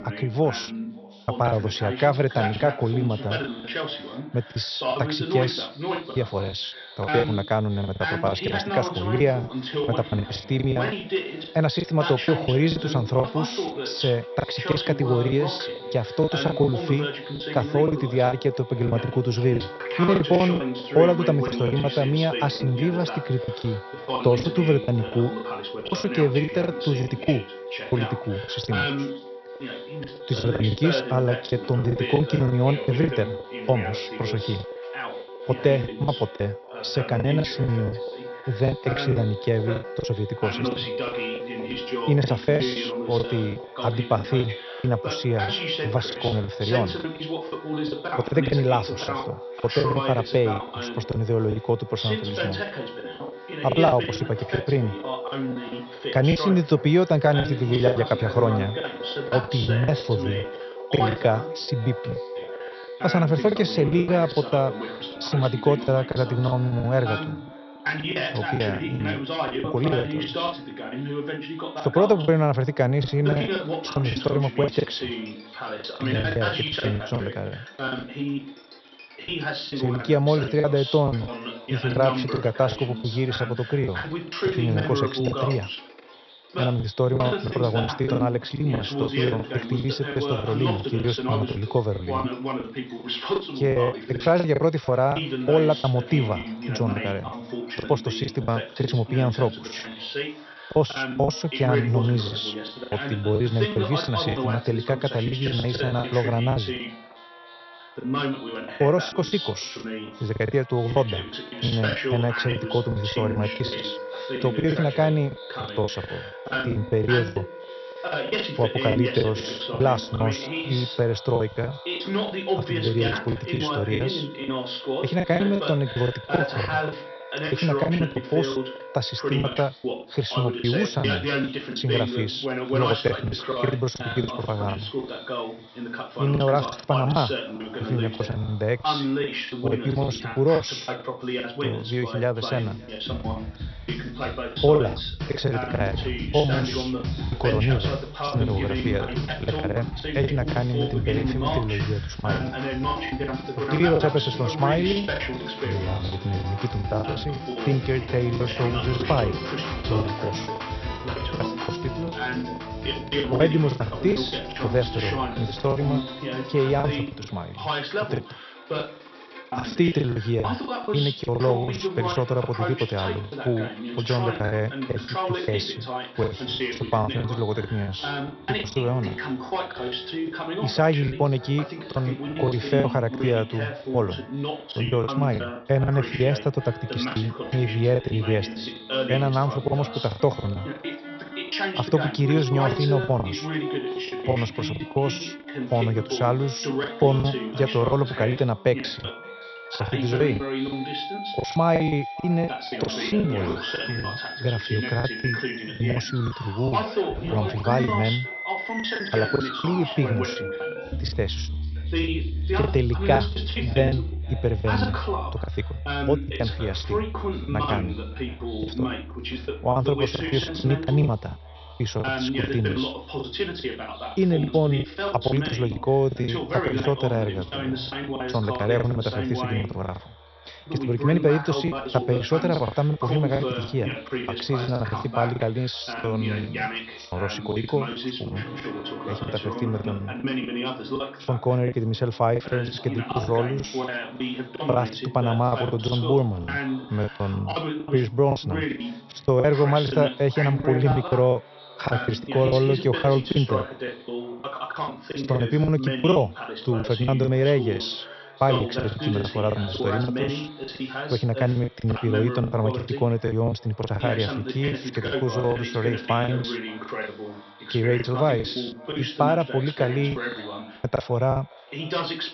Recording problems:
high frequencies cut off; noticeable; nothing above 5.5 kHz
echo of what is said; faint; throughout; 570 ms later, 20 dB below the speech
voice in the background; loud; throughout; 6 dB below the speech
background music; noticeable; throughout; 10 dB below the speech
choppy; very; 12% of the speech affected

